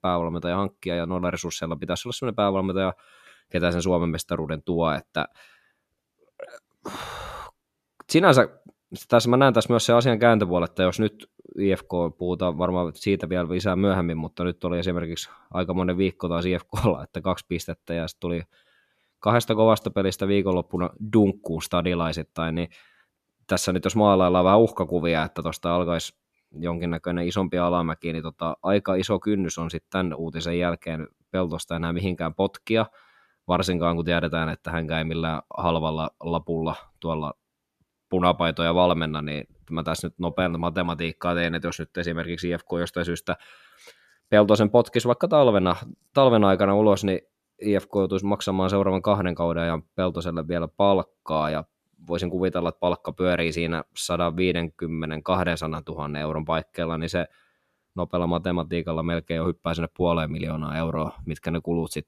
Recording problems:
none

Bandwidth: 14.5 kHz